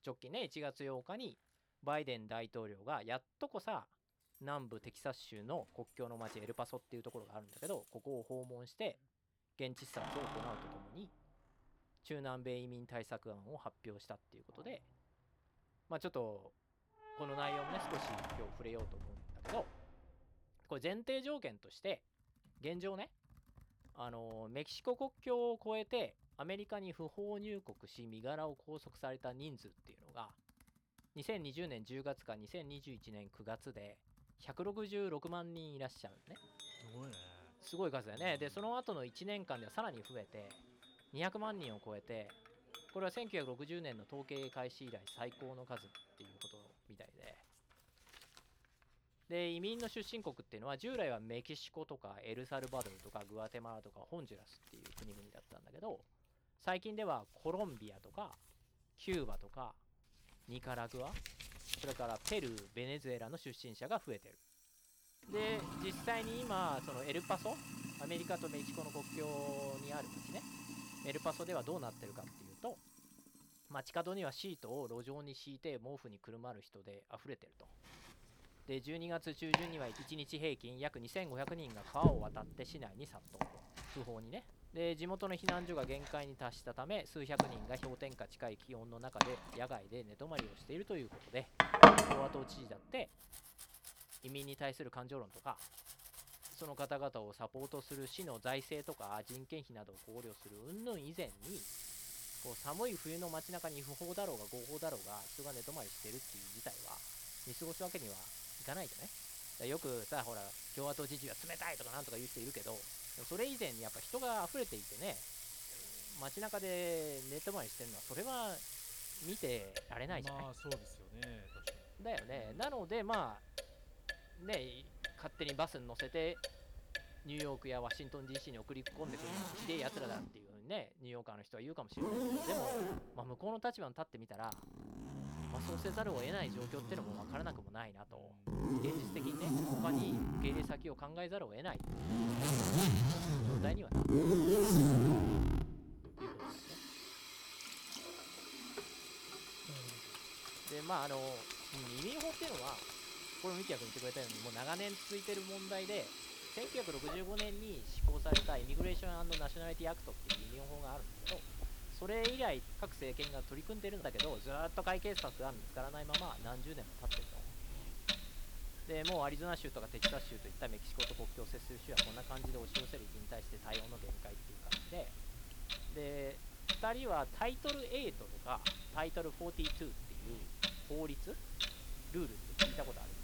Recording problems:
household noises; very loud; throughout; 5 dB above the speech

